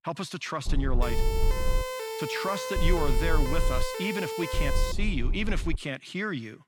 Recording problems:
low rumble; noticeable; from 0.5 to 2 s, from 3 to 4 s and from 4.5 to 6 s; 15 dB below the speech
siren; noticeable; from 1 to 5 s; peak 1 dB below the speech

